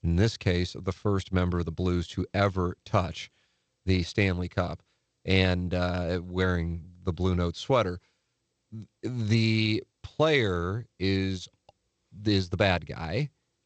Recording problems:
garbled, watery; slightly; nothing above 8 kHz

